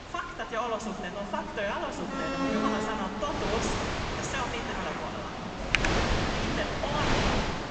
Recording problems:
room echo; noticeable; dies away in 2.6 s
high frequencies cut off; noticeable; nothing above 8 kHz
off-mic speech; somewhat distant
wind noise on the microphone; heavy; 1 dB above the speech
traffic noise; loud; throughout; 6 dB below the speech
alarm; loud; from 2 to 3.5 s; peak 6 dB above the speech
keyboard typing; loud; at 5.5 s; peak 6 dB above the speech

